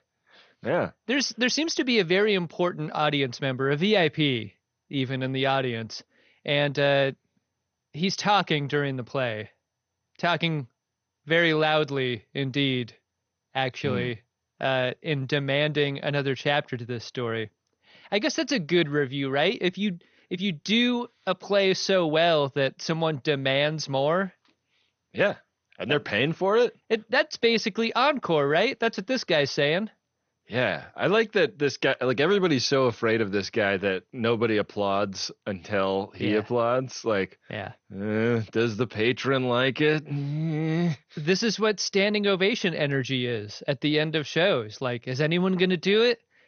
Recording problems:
garbled, watery; slightly; nothing above 6.5 kHz

